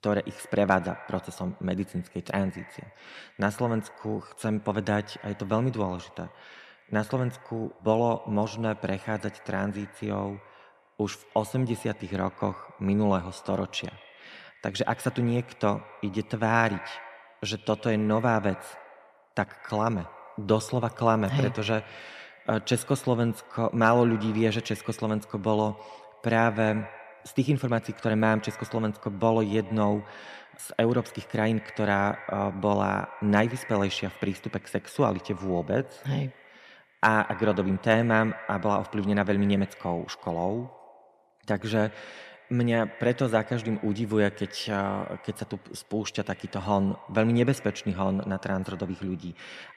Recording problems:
echo of what is said; faint; throughout; 100 ms later, 20 dB below the speech

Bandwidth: 14.5 kHz